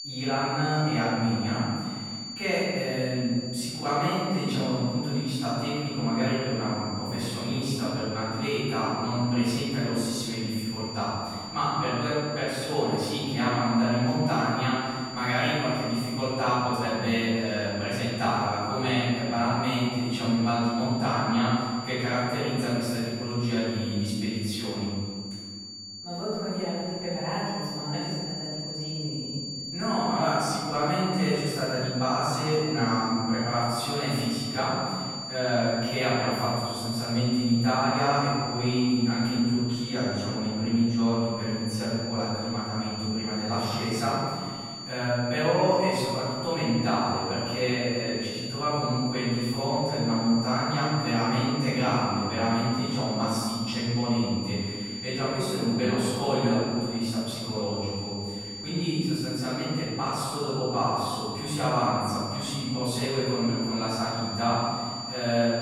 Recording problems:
room echo; strong; dies away in 2 s
off-mic speech; far
high-pitched whine; loud; throughout; 4.5 kHz, 8 dB below the speech

